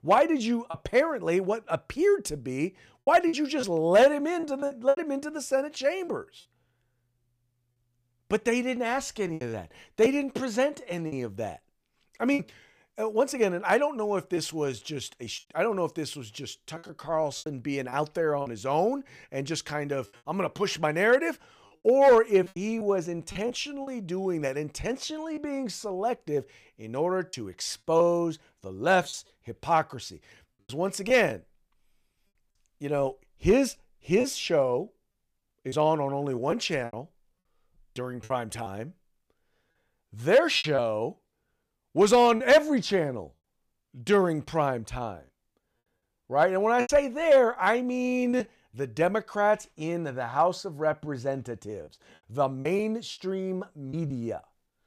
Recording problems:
choppy; very; 5% of the speech affected

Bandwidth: 15 kHz